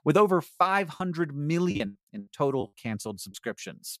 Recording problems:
choppy; very; from 1 to 3 s; 12% of the speech affected

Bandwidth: 14.5 kHz